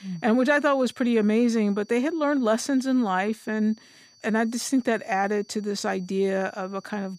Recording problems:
high-pitched whine; faint; throughout; 4.5 kHz, 30 dB below the speech

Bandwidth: 15 kHz